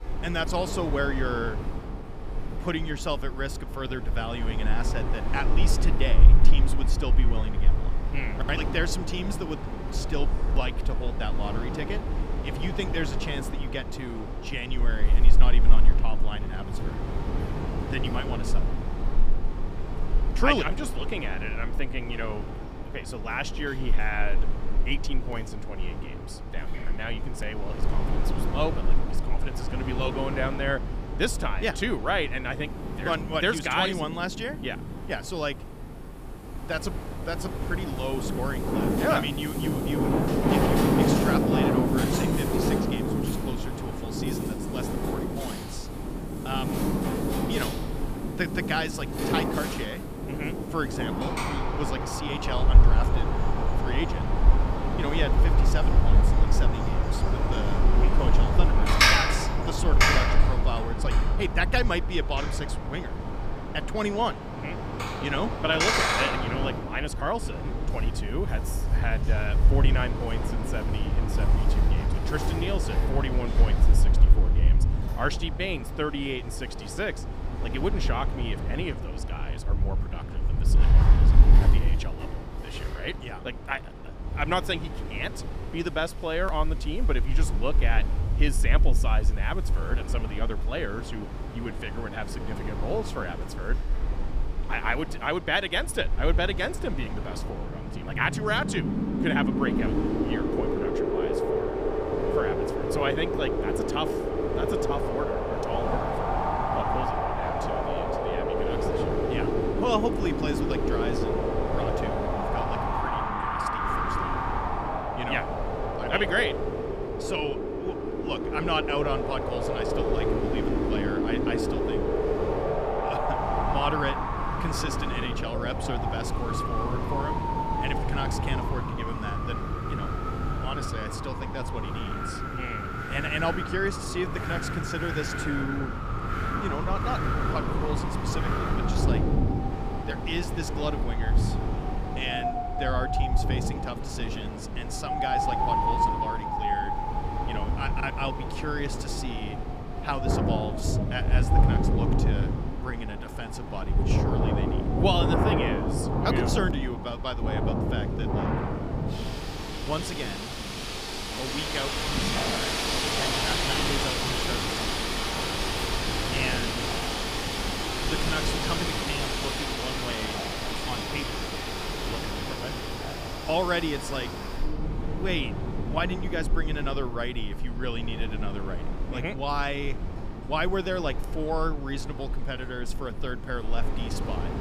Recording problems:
wind in the background; very loud; throughout; 4 dB above the speech

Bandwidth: 15 kHz